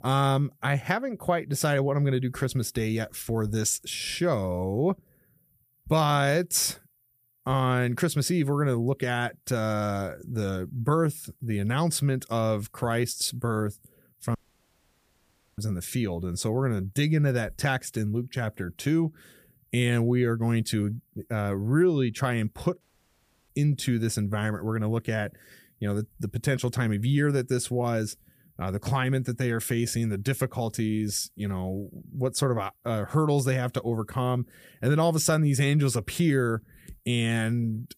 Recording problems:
audio cutting out; at 14 s for 1 s and at 23 s for 0.5 s

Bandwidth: 15 kHz